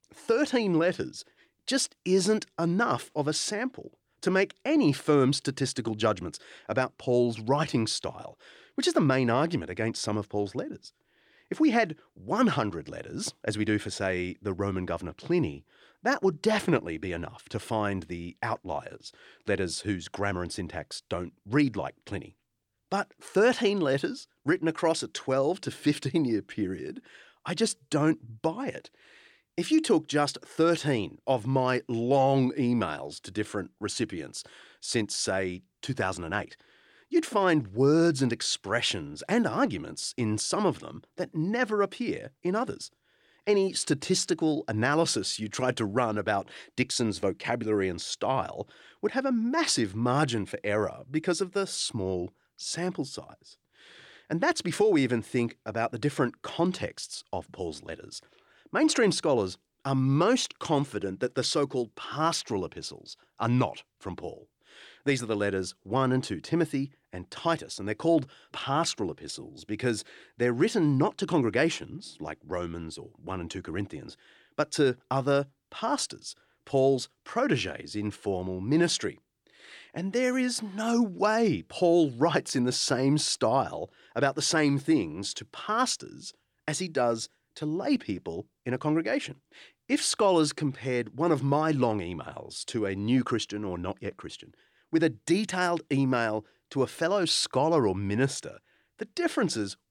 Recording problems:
none

